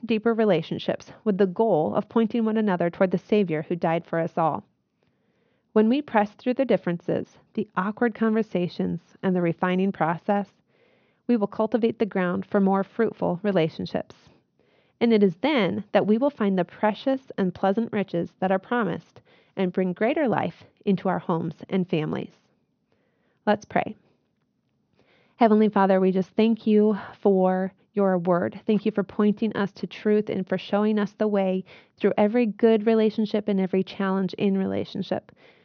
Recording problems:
high frequencies cut off; noticeable; nothing above 6.5 kHz

